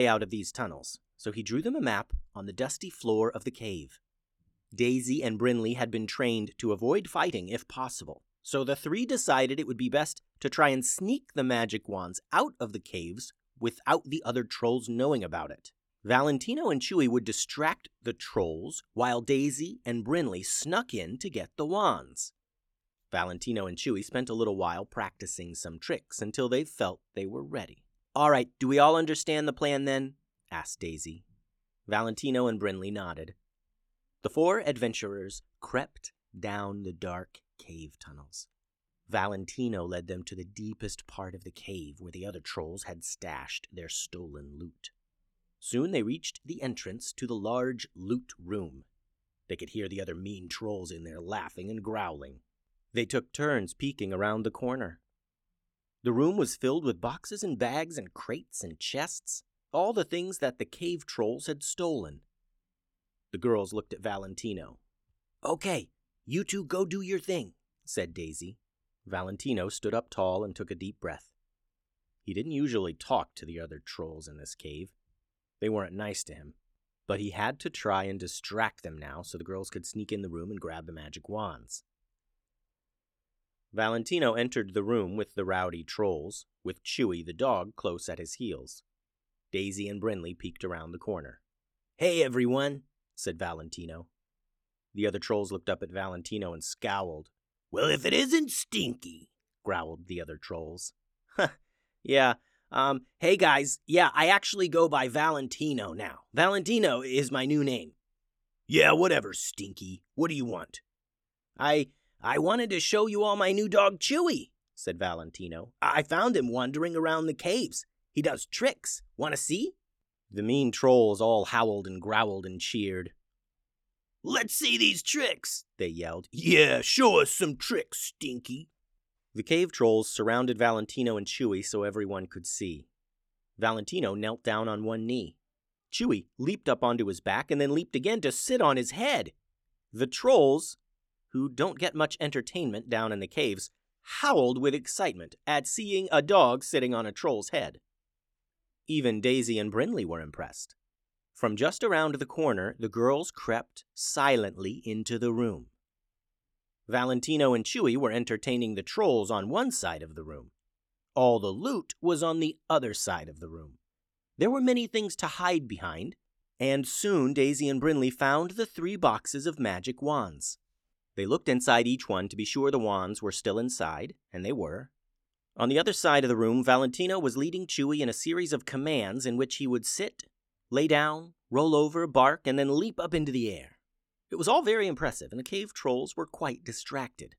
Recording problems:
abrupt cut into speech; at the start

